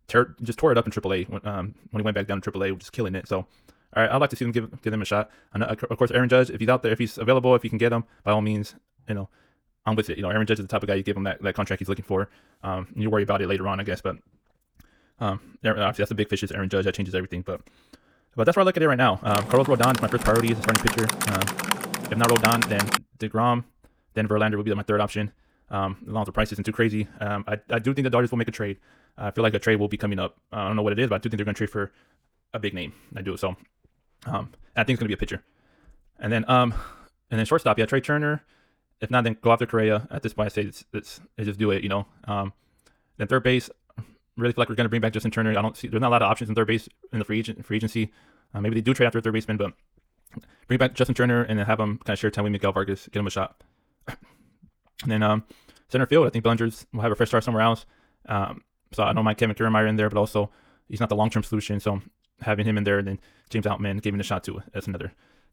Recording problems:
wrong speed, natural pitch; too fast; 1.6 times normal speed
keyboard typing; loud; from 19 to 23 s; peak 2 dB above the speech

